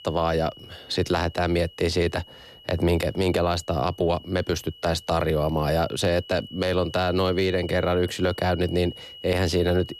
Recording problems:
high-pitched whine; noticeable; throughout; 3 kHz, 20 dB below the speech

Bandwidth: 14 kHz